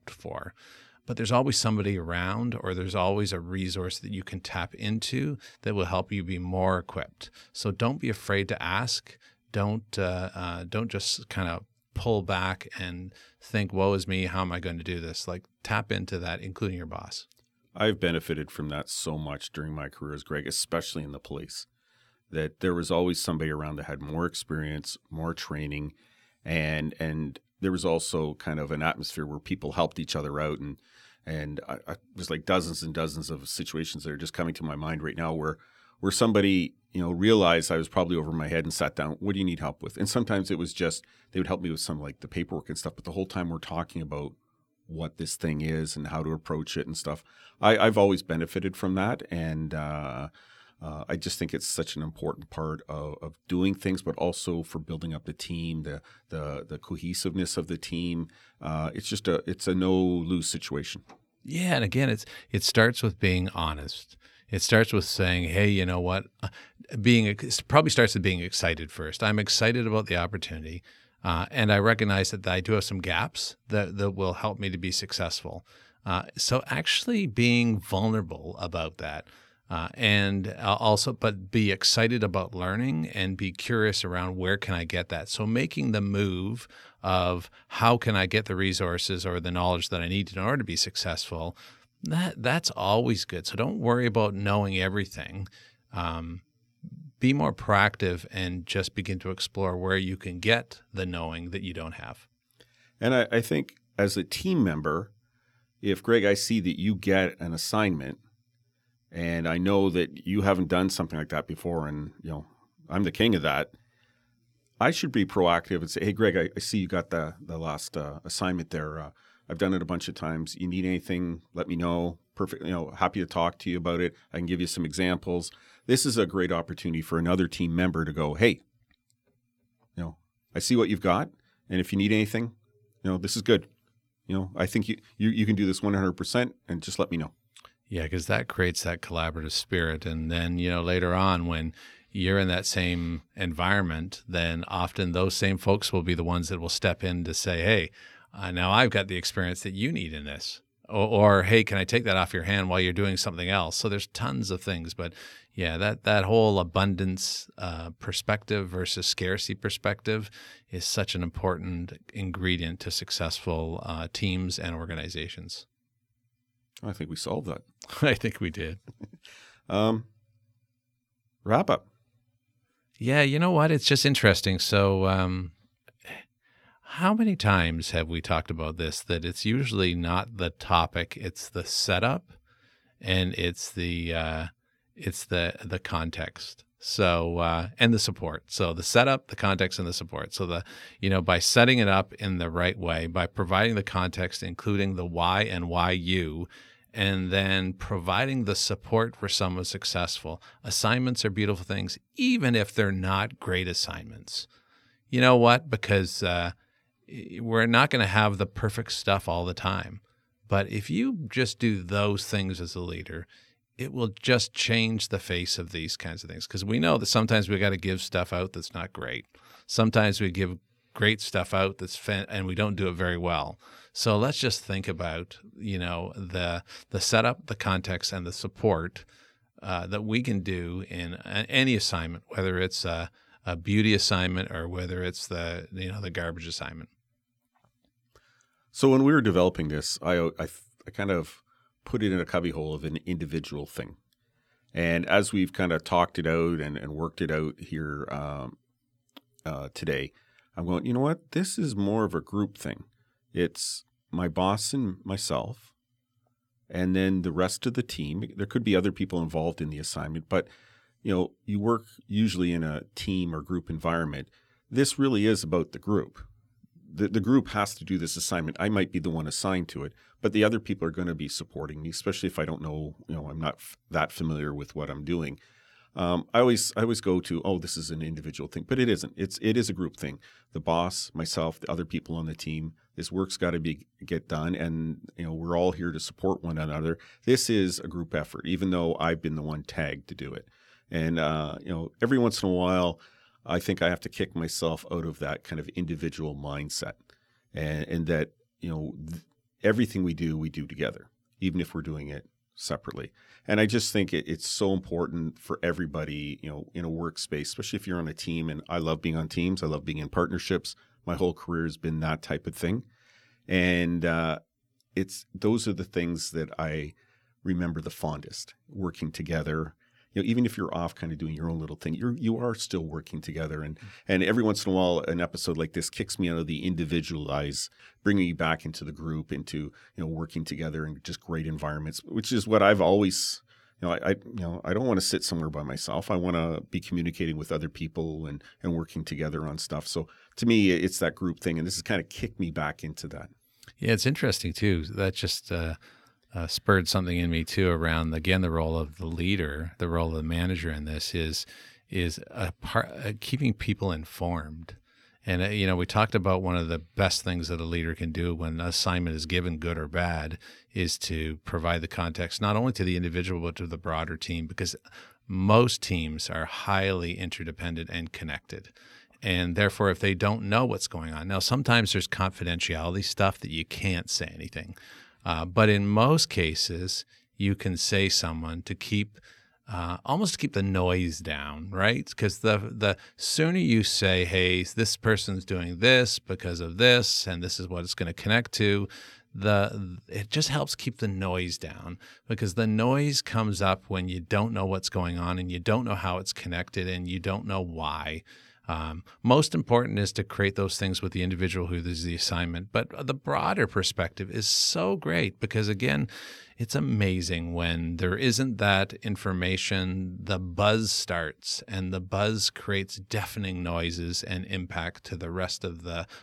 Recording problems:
none

